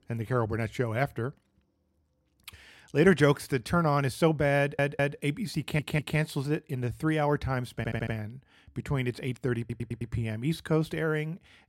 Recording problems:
audio stuttering; 4 times, first at 4.5 s

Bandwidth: 16 kHz